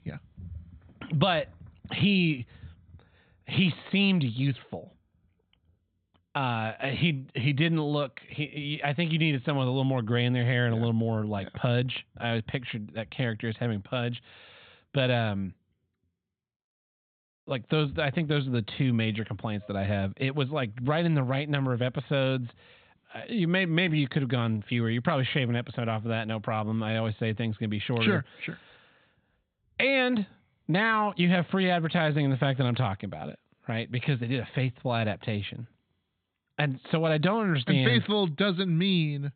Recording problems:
high frequencies cut off; severe; nothing above 4 kHz

